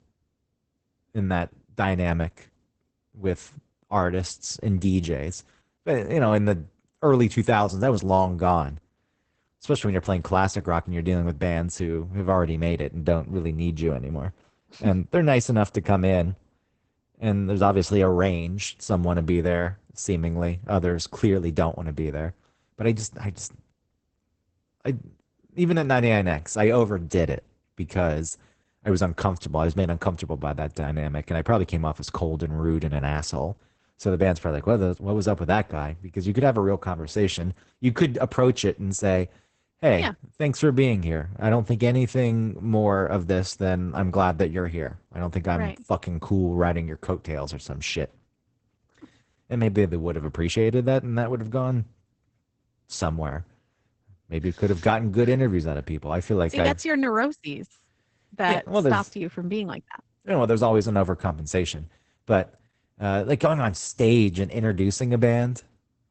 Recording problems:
garbled, watery; badly; nothing above 8 kHz

